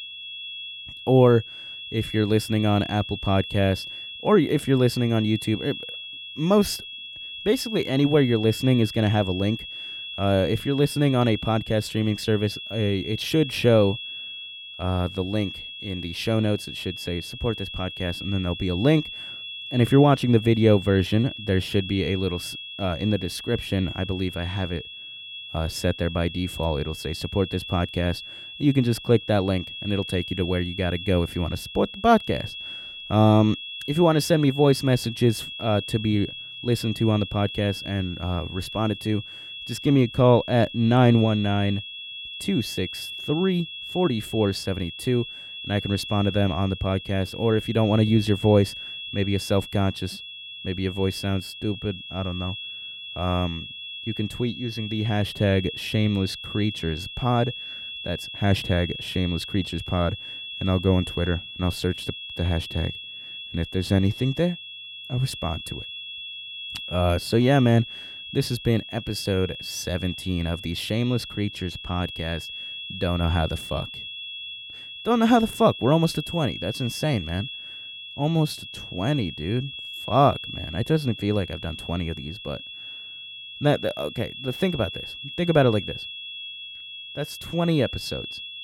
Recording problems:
high-pitched whine; loud; throughout; 3.5 kHz, 10 dB below the speech

